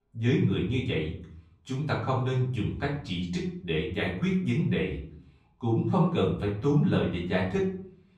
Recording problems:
off-mic speech; far
room echo; noticeable; dies away in 0.5 s

